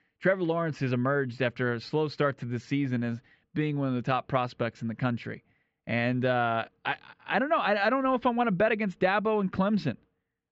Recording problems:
high frequencies cut off; noticeable; nothing above 7.5 kHz
muffled; very slightly; fading above 2.5 kHz

